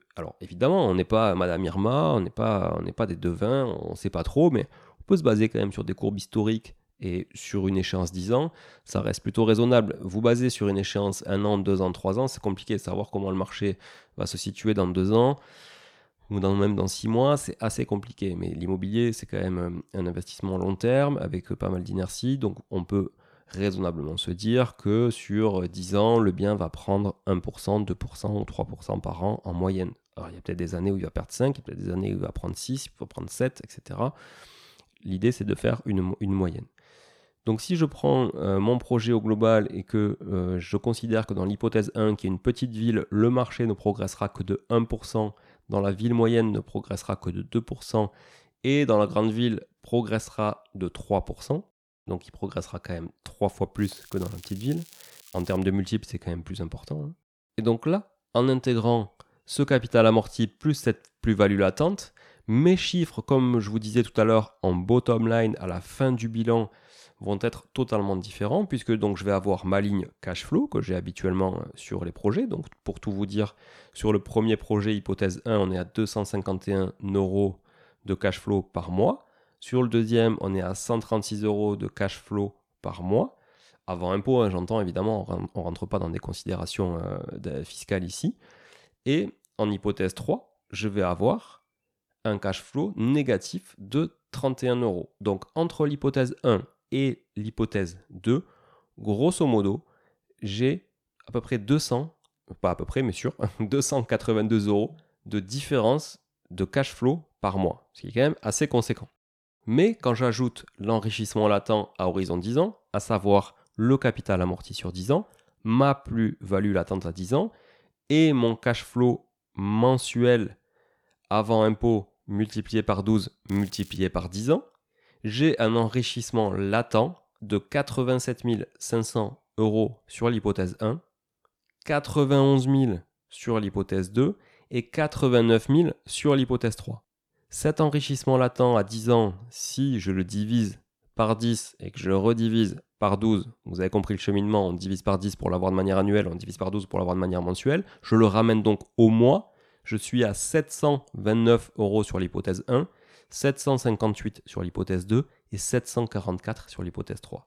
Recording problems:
crackling; faint; from 54 to 56 s and at 2:03; 25 dB below the speech

